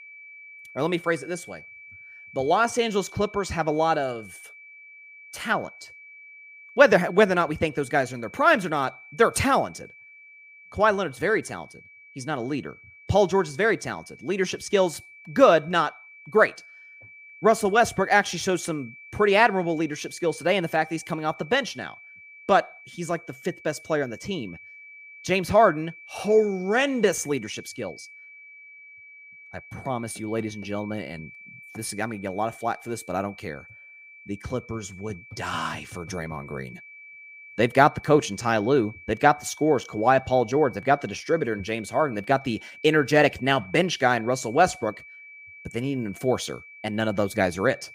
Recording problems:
high-pitched whine; faint; throughout; 2.5 kHz, 20 dB below the speech

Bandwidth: 15.5 kHz